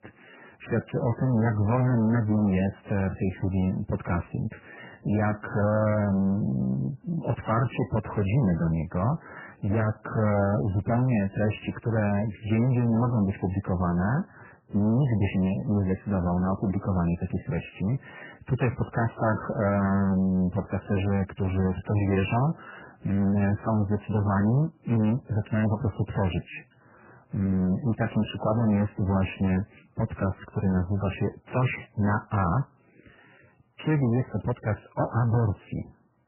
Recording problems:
distortion; heavy; 6 dB below the speech
garbled, watery; badly; nothing above 3 kHz

